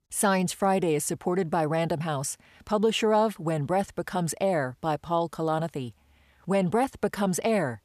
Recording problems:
none

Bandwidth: 14.5 kHz